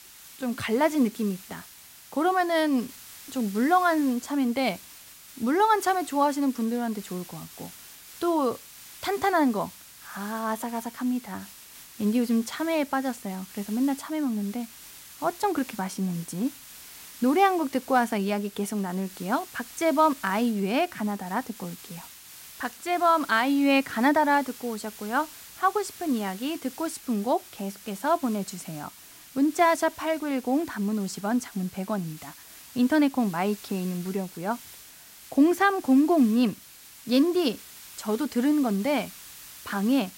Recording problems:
hiss; noticeable; throughout; 20 dB below the speech

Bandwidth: 16 kHz